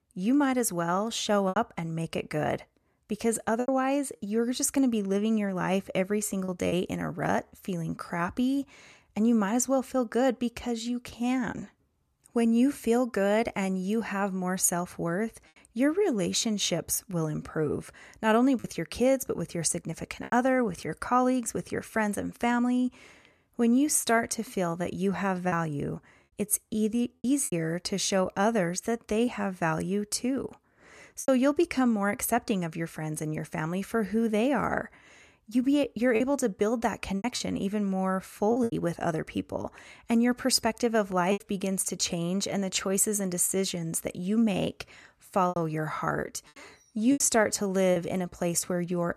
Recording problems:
choppy; occasionally; 3% of the speech affected

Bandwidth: 14 kHz